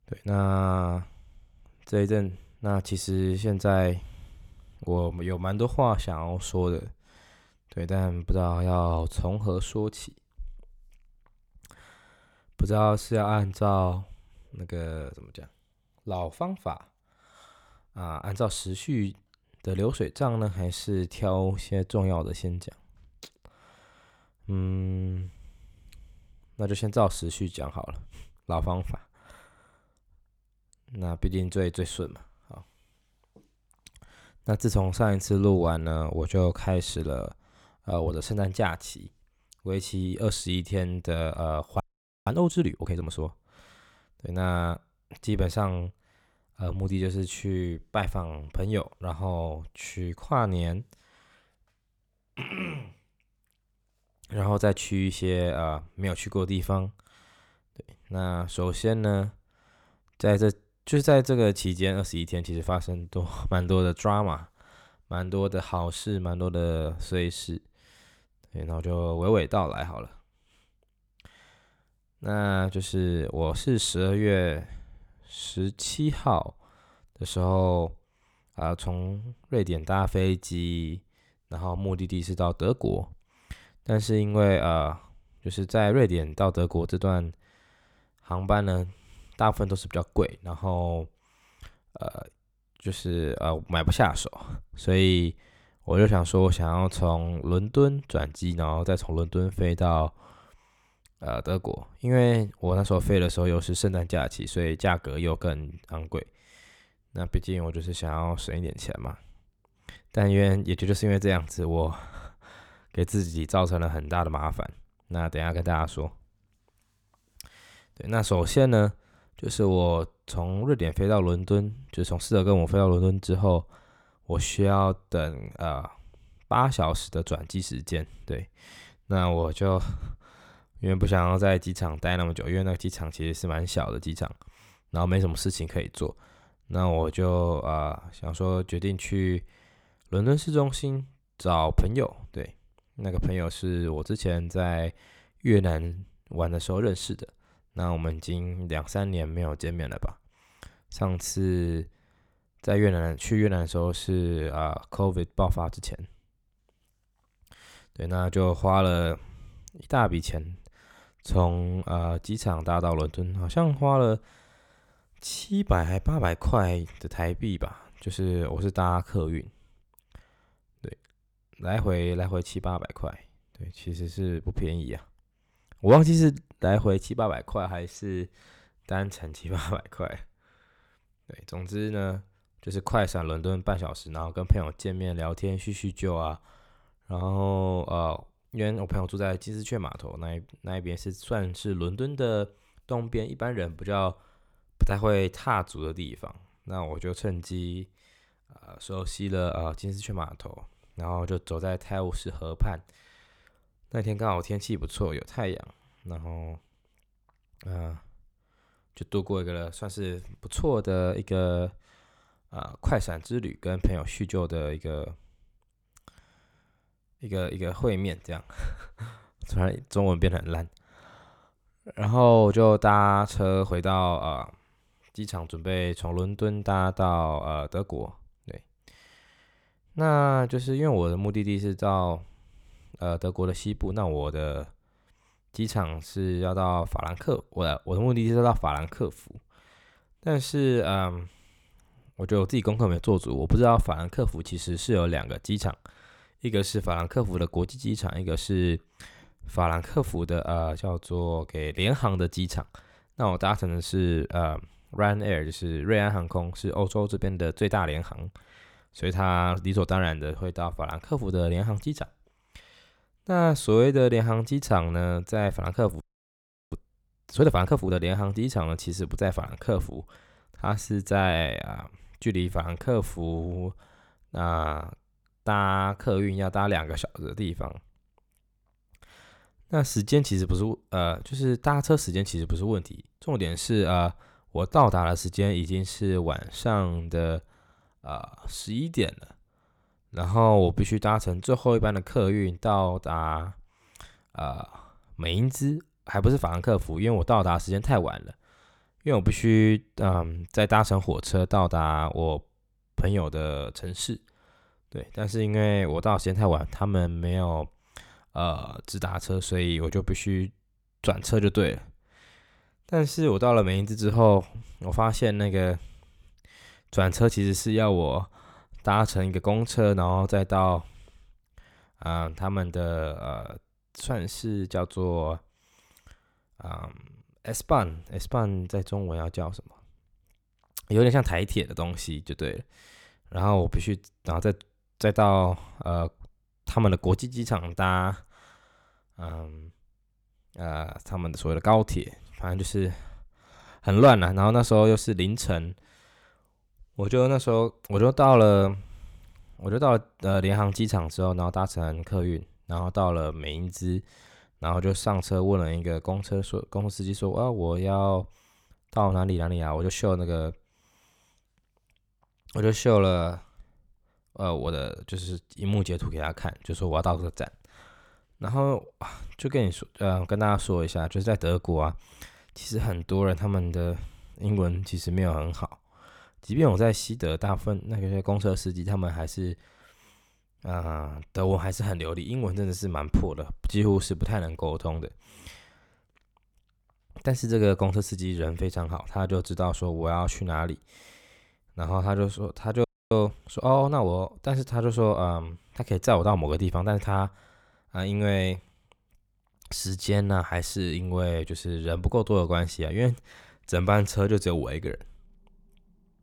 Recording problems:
audio freezing; at 42 s, at 4:26 for 0.5 s and at 6:33

